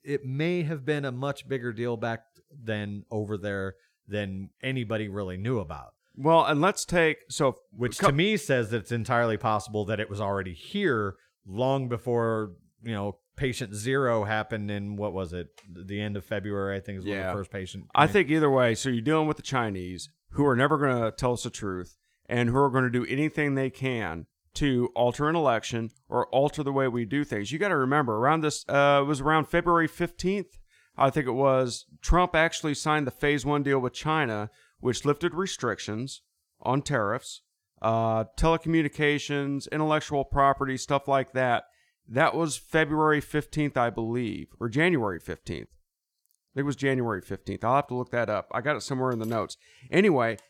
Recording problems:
none

